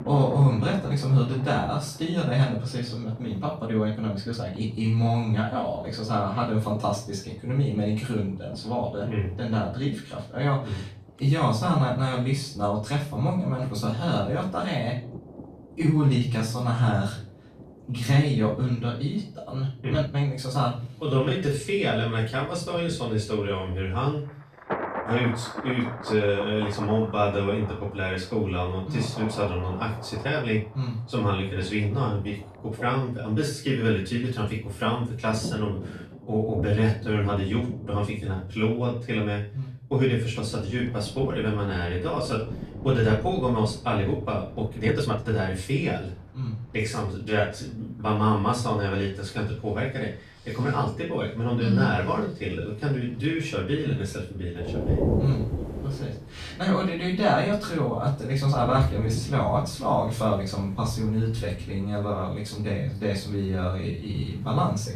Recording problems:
off-mic speech; far
room echo; slight; dies away in 0.3 s
rain or running water; noticeable; throughout; 10 dB below the speech
uneven, jittery; strongly; from 3.5 s to 1:04

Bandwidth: 14 kHz